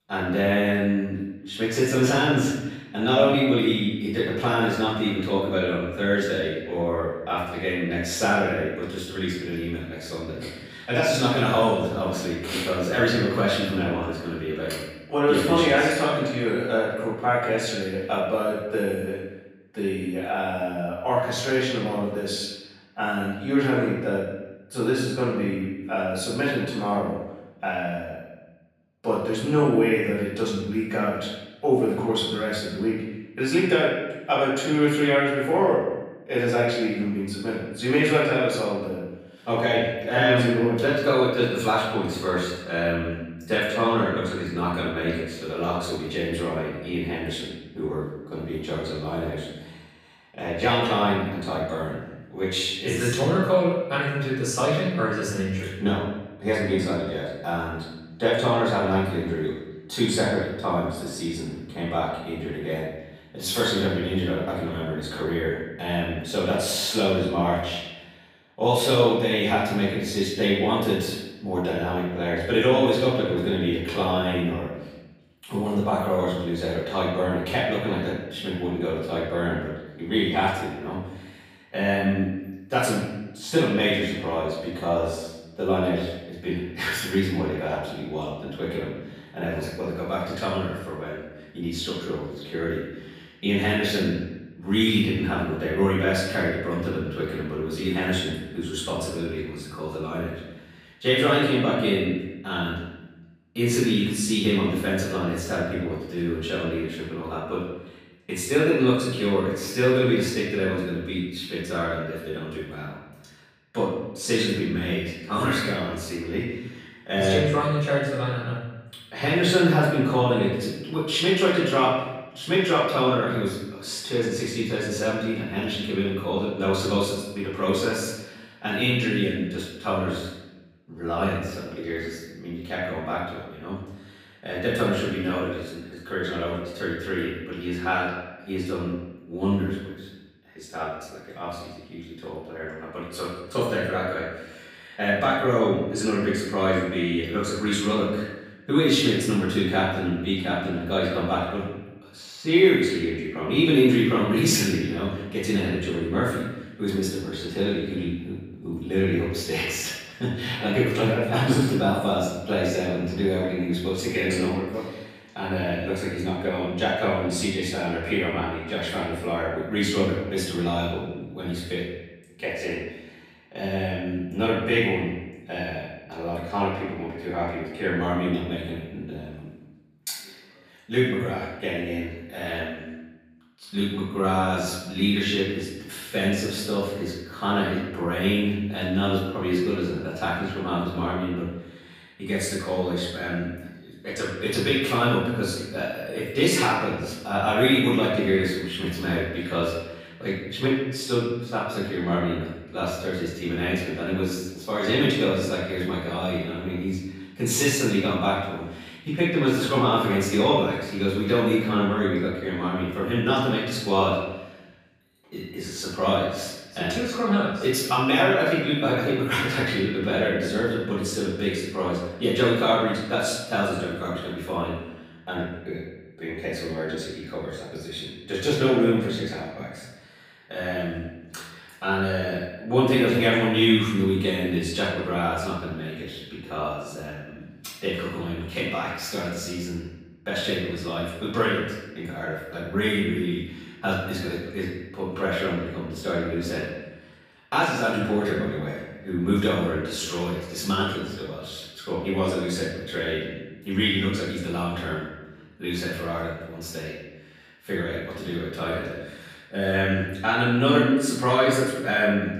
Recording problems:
off-mic speech; far
room echo; noticeable; dies away in 1 s

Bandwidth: 15 kHz